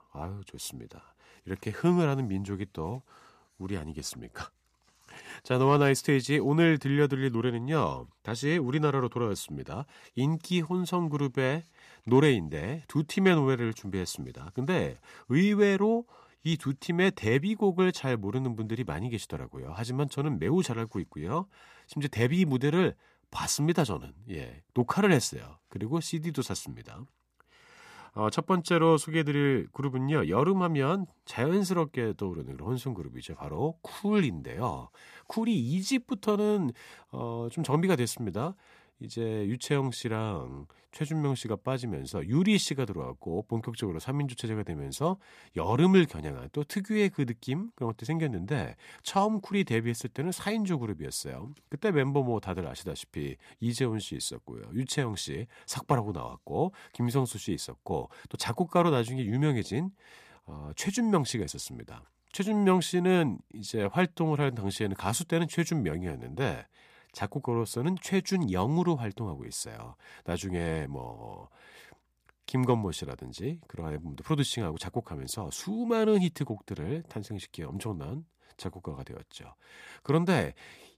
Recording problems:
none

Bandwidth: 14.5 kHz